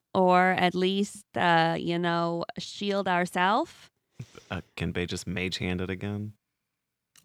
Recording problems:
none

